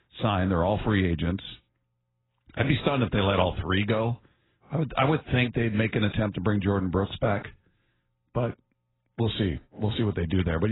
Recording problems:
garbled, watery; badly; nothing above 4 kHz
abrupt cut into speech; at the end

